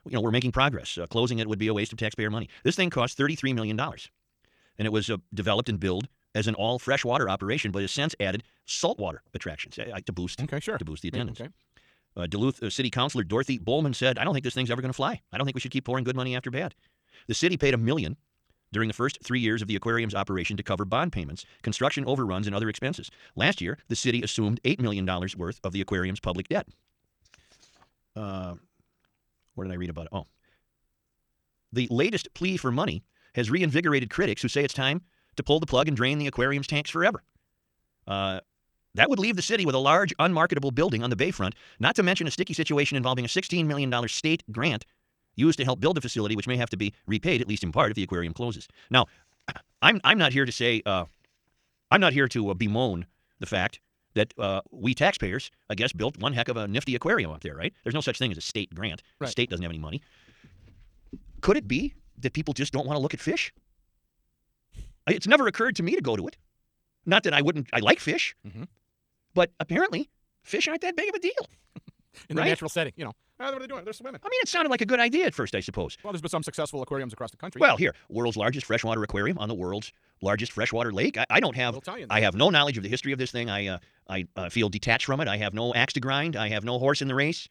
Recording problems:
wrong speed, natural pitch; too fast; 1.7 times normal speed

